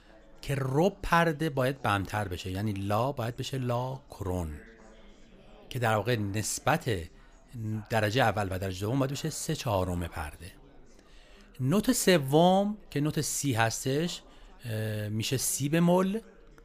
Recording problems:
background chatter; faint; throughout; 4 voices, 30 dB below the speech

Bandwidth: 15 kHz